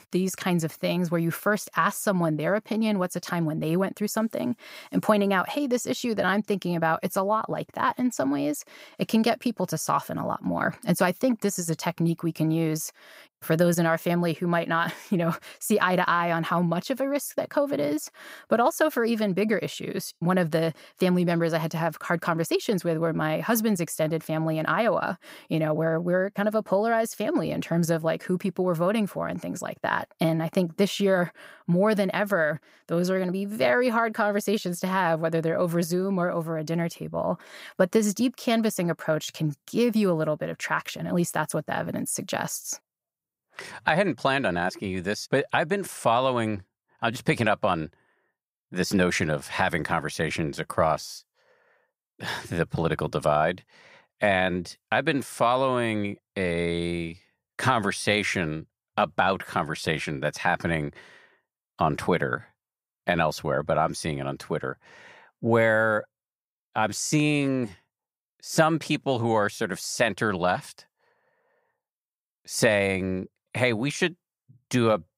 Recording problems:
none

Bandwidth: 15.5 kHz